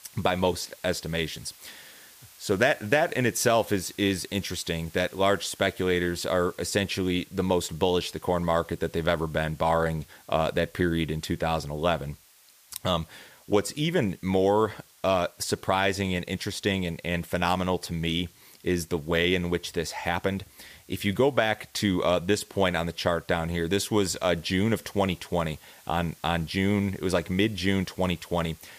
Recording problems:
hiss; faint; throughout; 25 dB below the speech

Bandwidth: 15 kHz